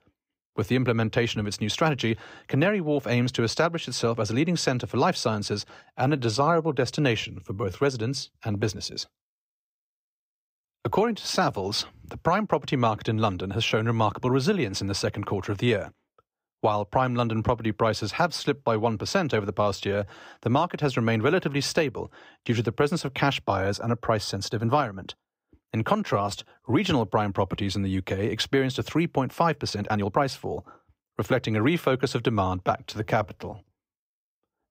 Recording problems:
uneven, jittery; strongly; from 6 to 34 s

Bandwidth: 15.5 kHz